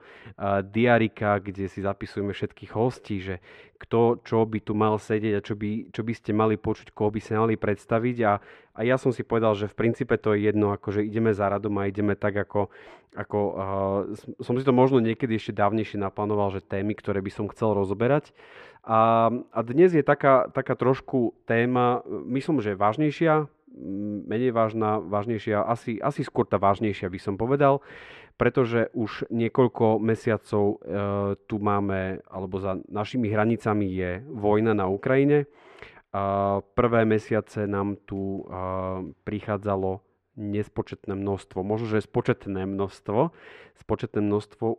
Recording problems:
muffled; very; fading above 2 kHz

